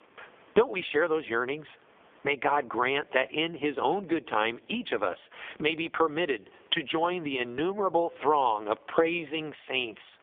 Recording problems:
phone-call audio; poor line; nothing above 3.5 kHz
squashed, flat; somewhat

